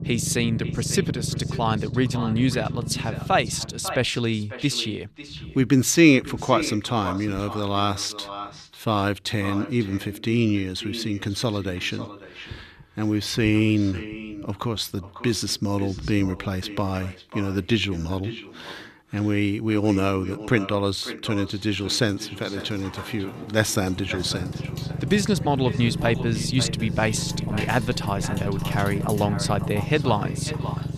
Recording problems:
echo of what is said; noticeable; throughout; 550 ms later, 15 dB below the speech
household noises; noticeable; from 22 s on; 20 dB below the speech
low rumble; noticeable; throughout; 15 dB below the speech

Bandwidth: 14.5 kHz